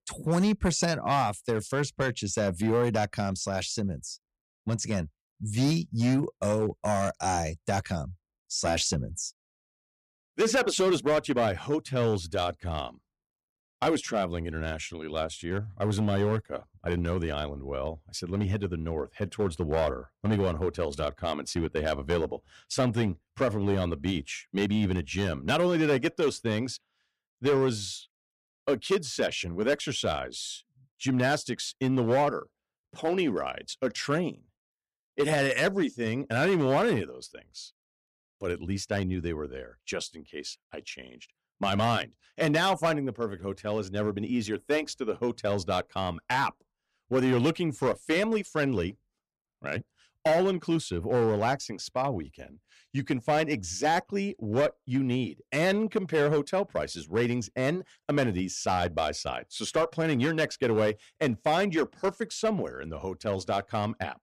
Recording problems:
distortion; slight; 5% of the sound clipped

